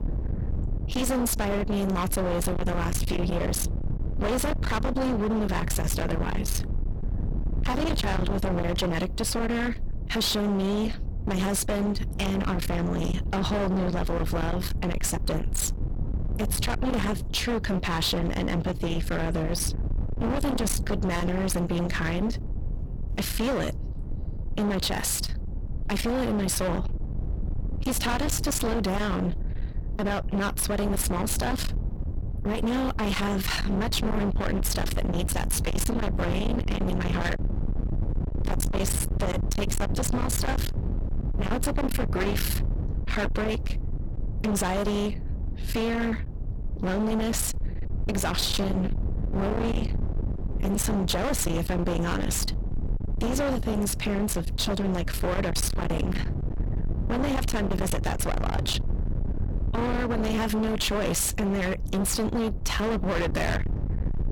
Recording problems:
distortion; heavy; 48% of the sound clipped
low rumble; loud; throughout; 8 dB below the speech

